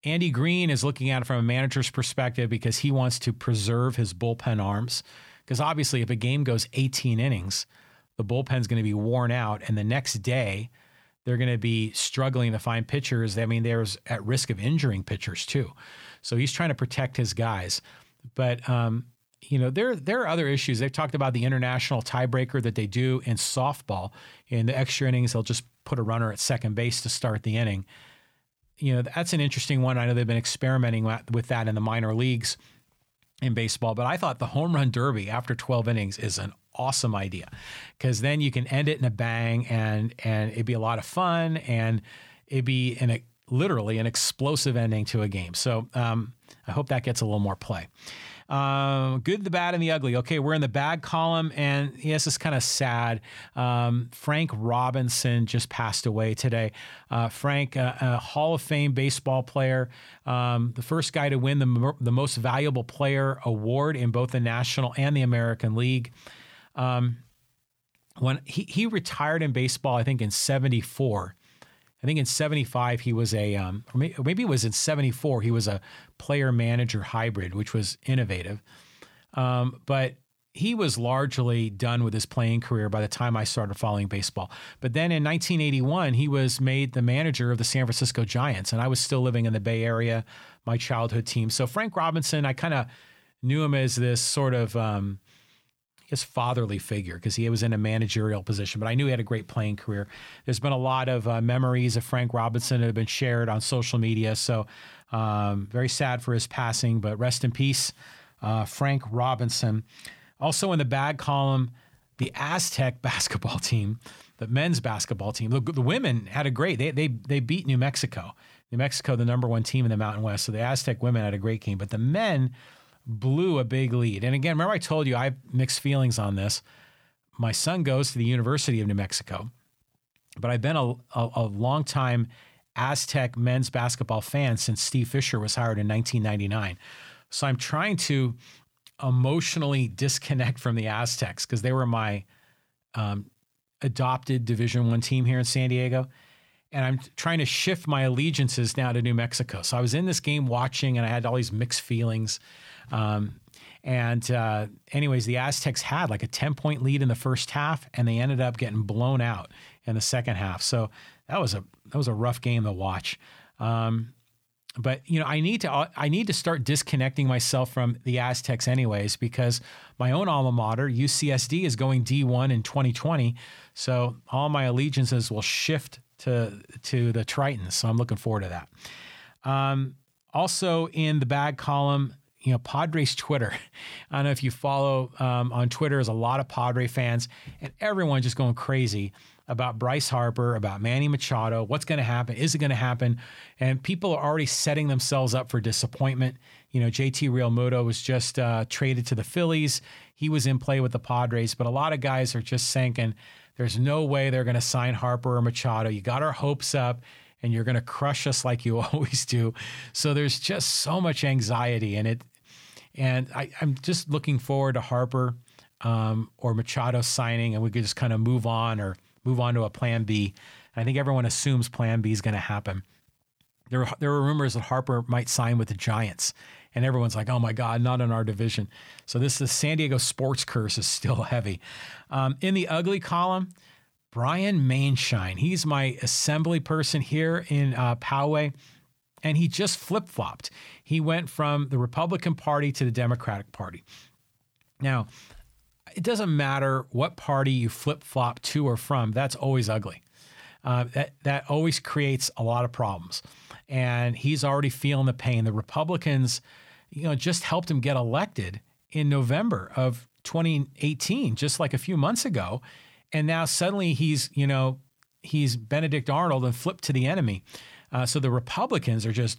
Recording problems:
none

